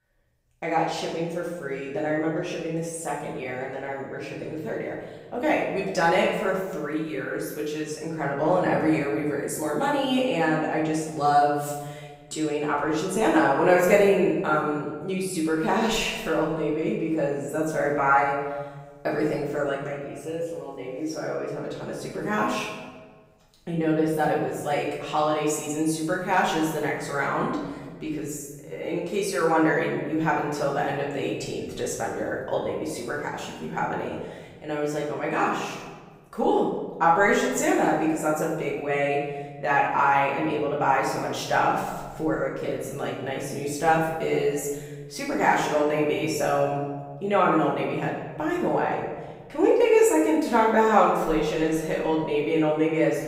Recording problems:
off-mic speech; far
room echo; noticeable; dies away in 1.4 s

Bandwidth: 15.5 kHz